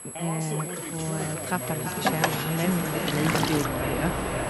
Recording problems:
echo of what is said; strong; from 1.5 s on; 340 ms later, 6 dB below the speech
train or aircraft noise; very loud; throughout; as loud as the speech
high-pitched whine; loud; throughout; 11.5 kHz, 5 dB below the speech
voice in the background; loud; throughout; 7 dB below the speech

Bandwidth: 14.5 kHz